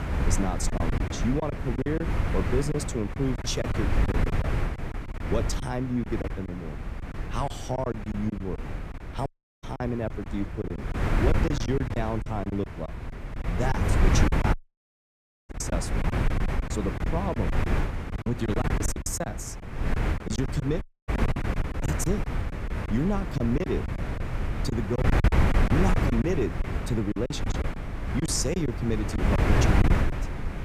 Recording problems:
wind noise on the microphone; heavy; 1 dB below the speech
choppy; very; 12% of the speech affected
audio cutting out; at 9.5 s, at 15 s for 1 s and at 21 s

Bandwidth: 15 kHz